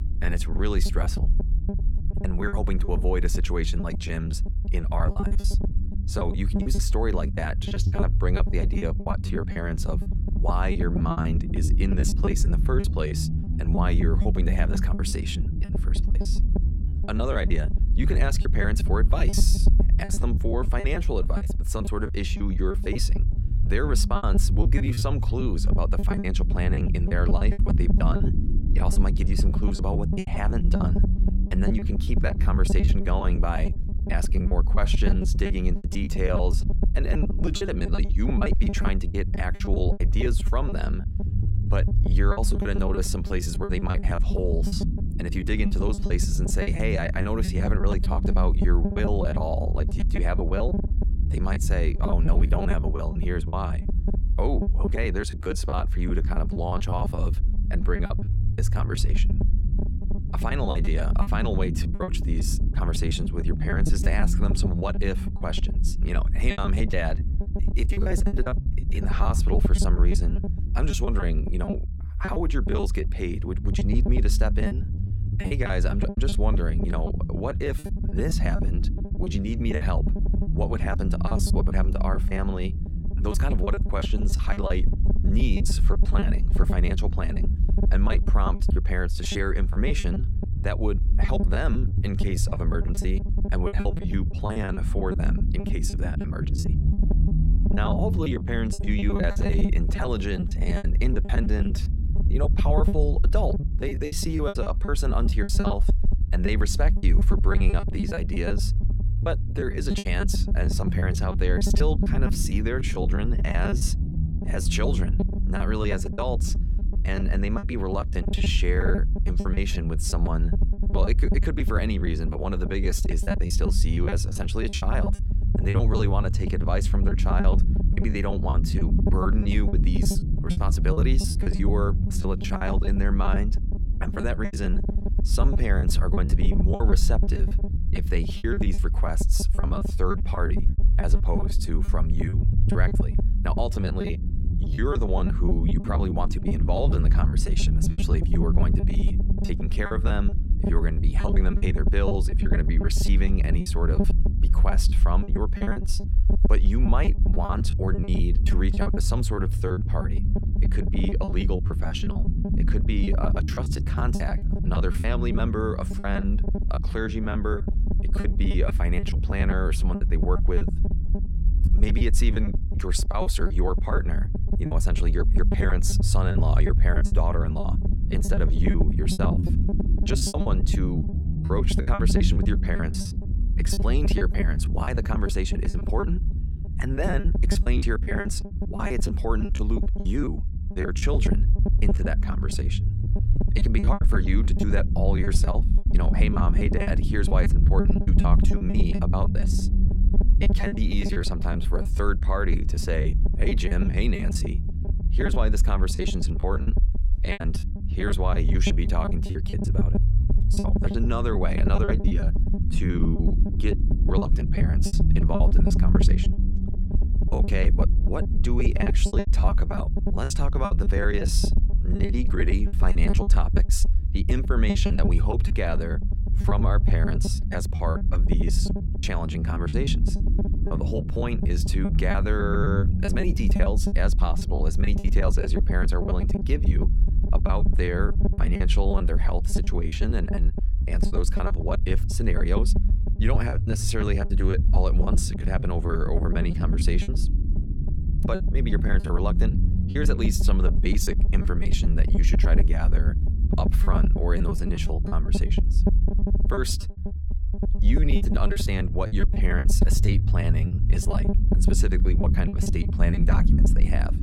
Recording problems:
low rumble; loud; throughout; 7 dB below the speech
choppy; very; 16% of the speech affected

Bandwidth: 17 kHz